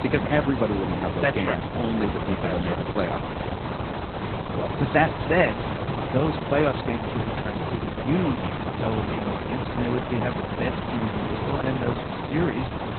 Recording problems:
garbled, watery; badly; nothing above 4 kHz
hiss; loud; throughout; 3 dB below the speech

